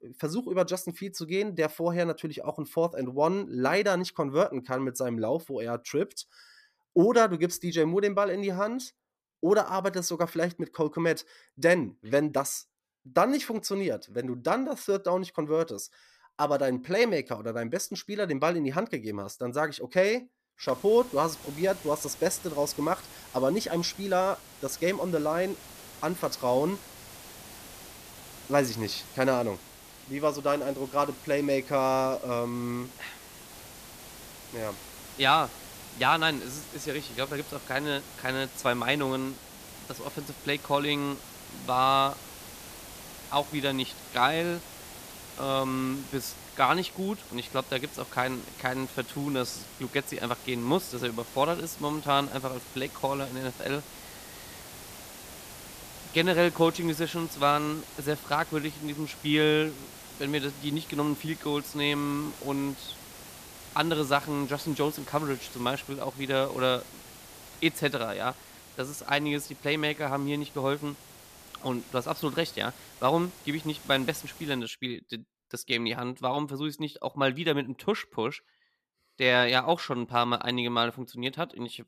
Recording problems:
hiss; noticeable; from 21 s to 1:15; 15 dB below the speech

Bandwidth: 14.5 kHz